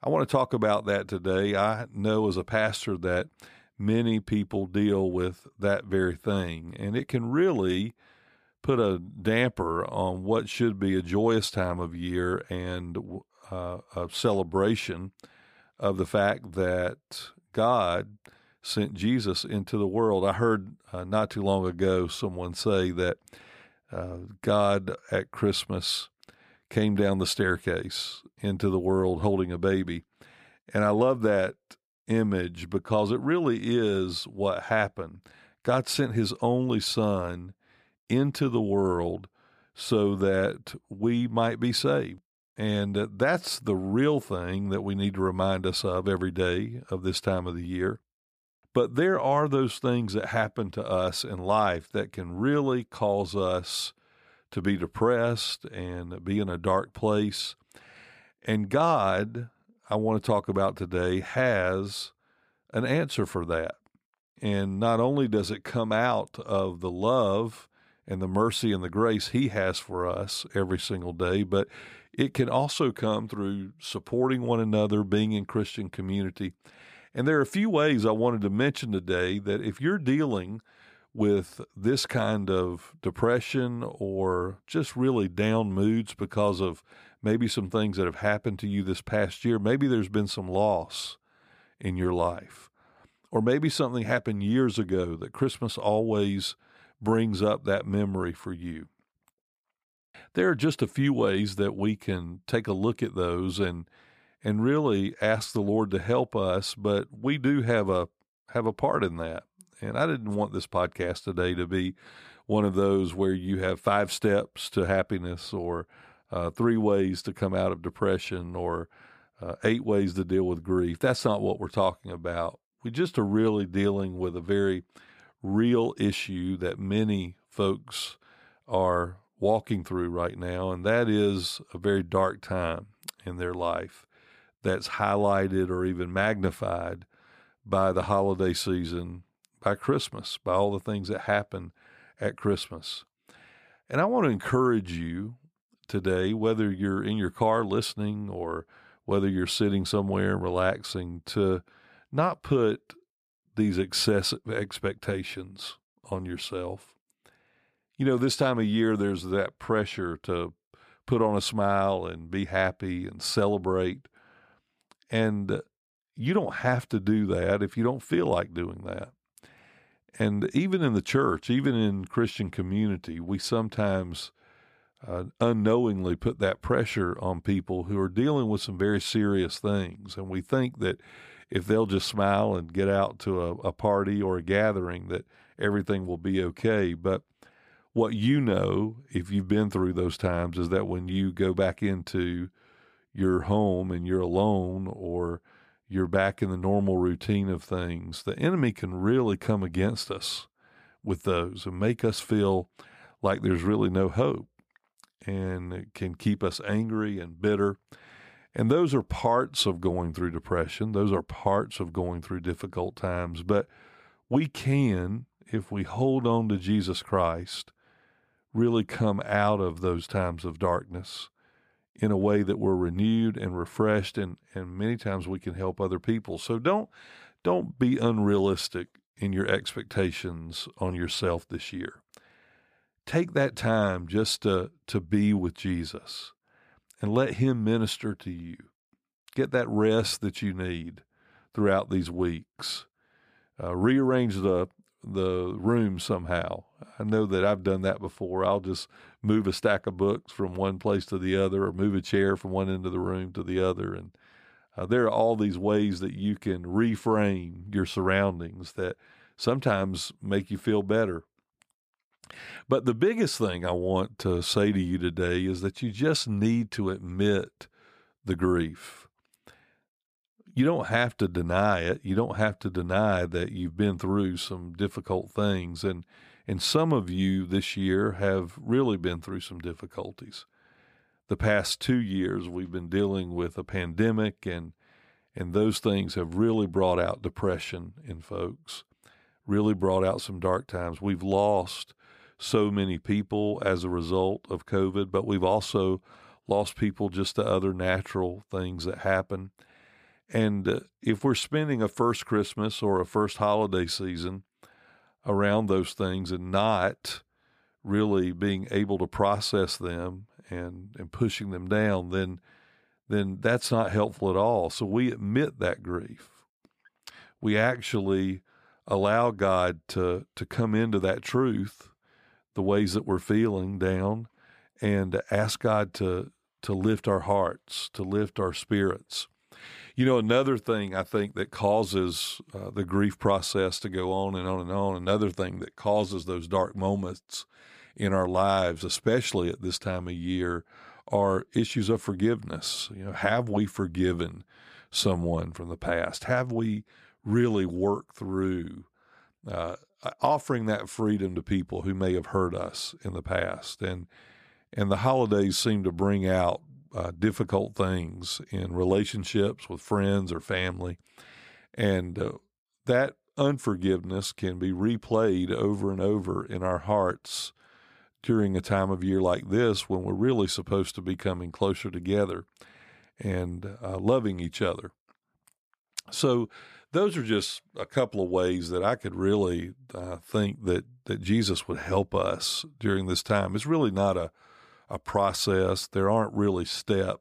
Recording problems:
none

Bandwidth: 15 kHz